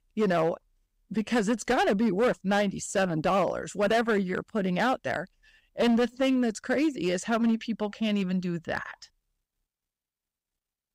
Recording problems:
distortion; slight; 7% of the sound clipped

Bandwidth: 15.5 kHz